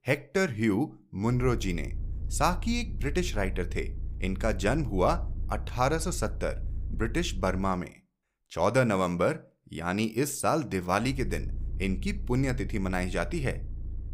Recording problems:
low rumble; faint; from 1.5 to 7.5 s and from 11 s on; 25 dB below the speech

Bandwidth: 15.5 kHz